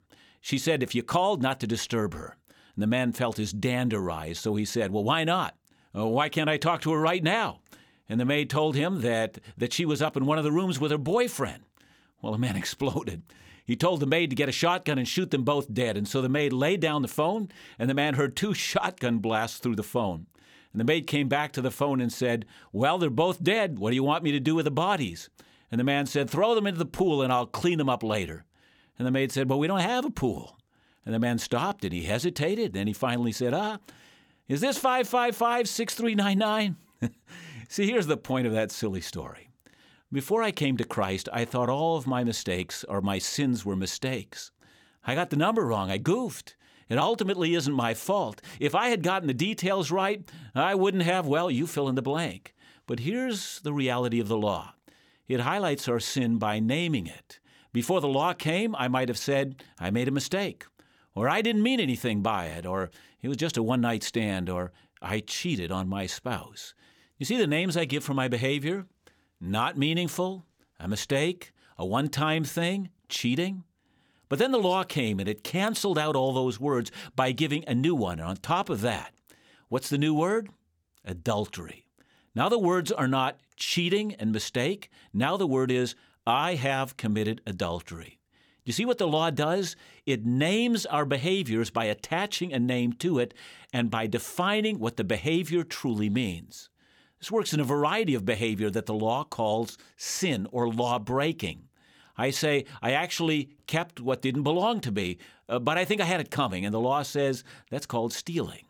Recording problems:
none

